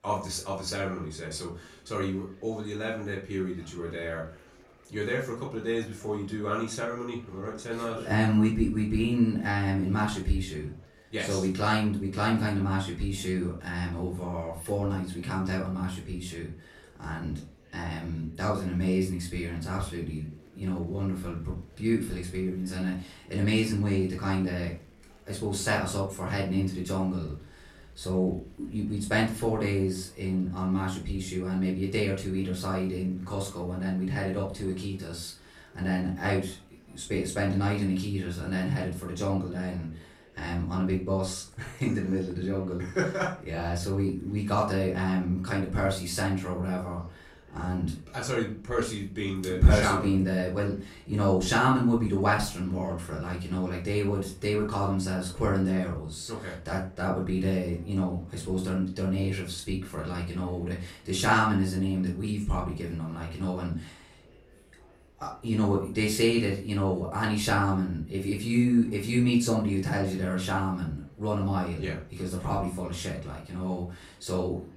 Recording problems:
off-mic speech; far
room echo; slight; dies away in 0.3 s
murmuring crowd; faint; throughout; 30 dB below the speech

